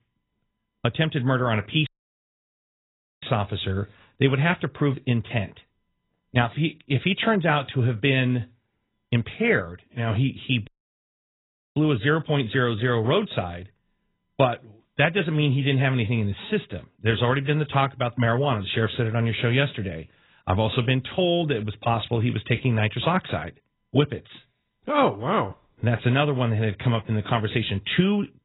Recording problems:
garbled, watery; badly; nothing above 4 kHz
audio cutting out; at 2 s for 1.5 s and at 11 s for 1 s

